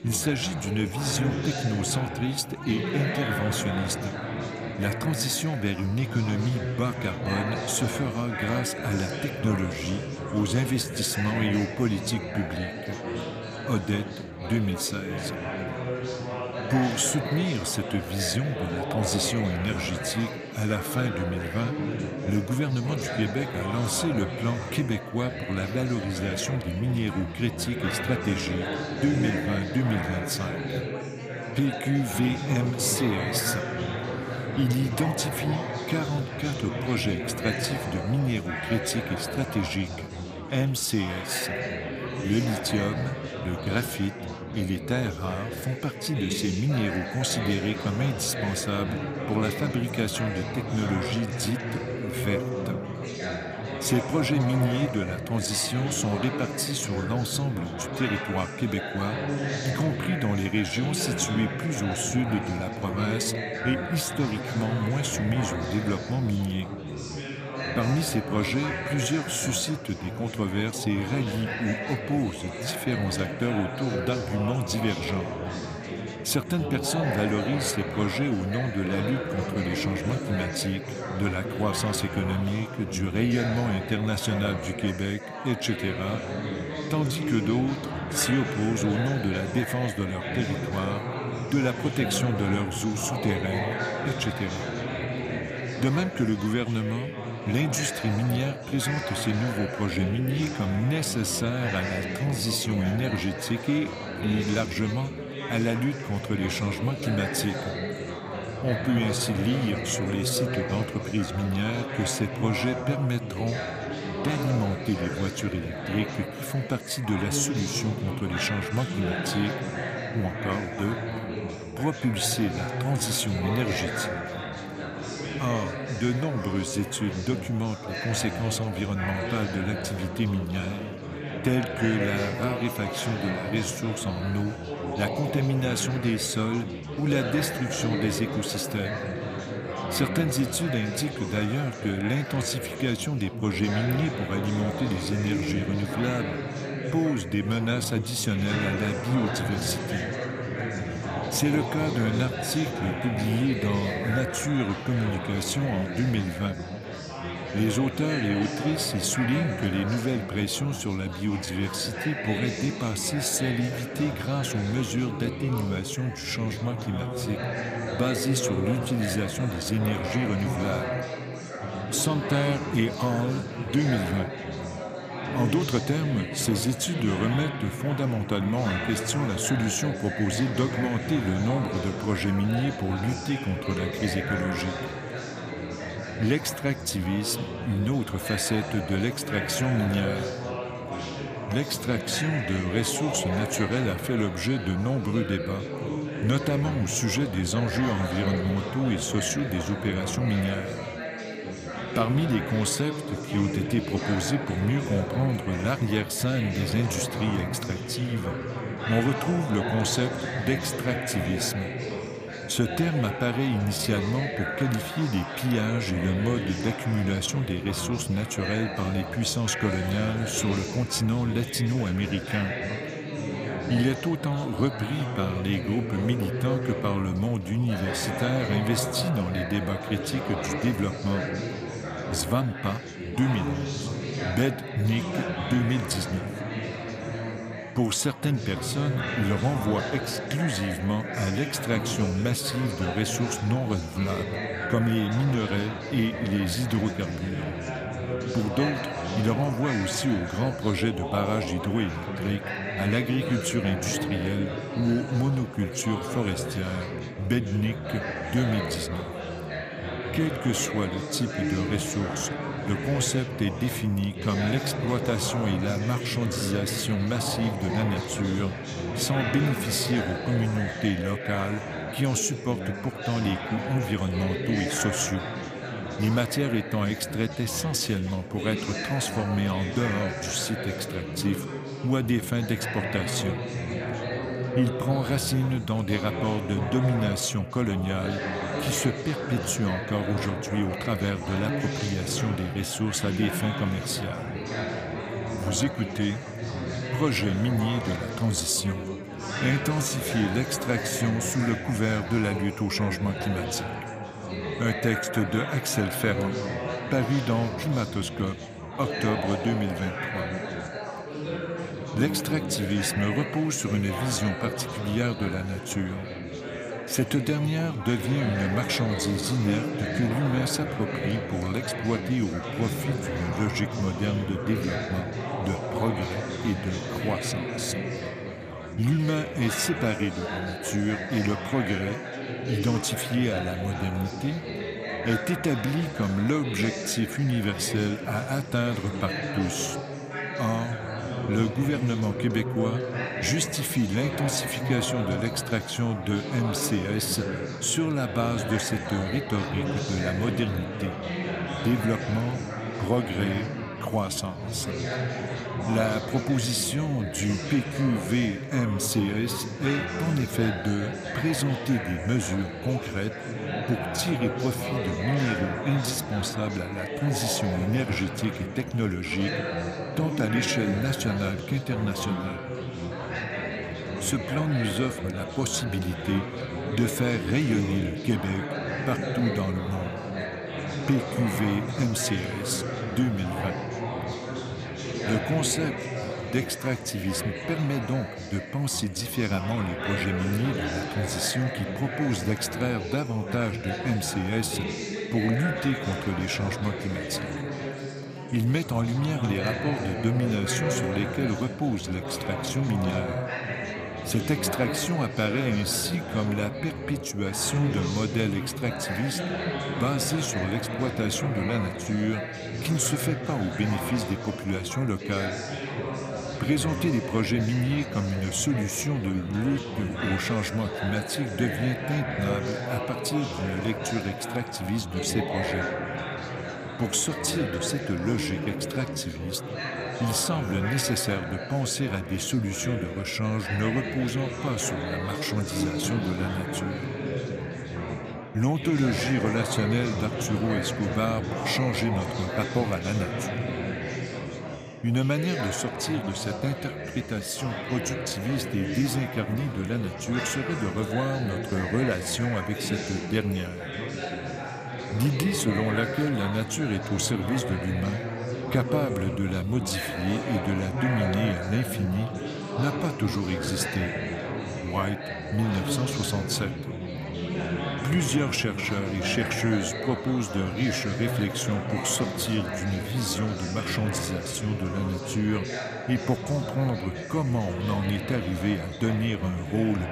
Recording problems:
chatter from many people; loud; throughout; 4 dB below the speech

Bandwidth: 15 kHz